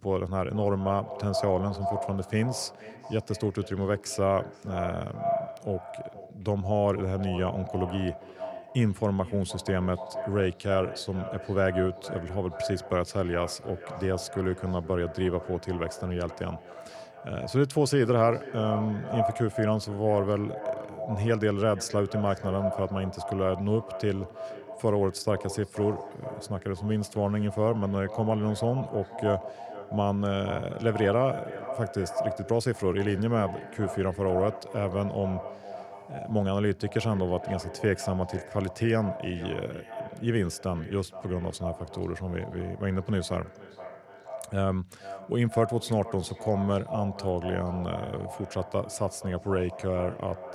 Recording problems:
echo of what is said; strong; throughout; 470 ms later, 10 dB below the speech

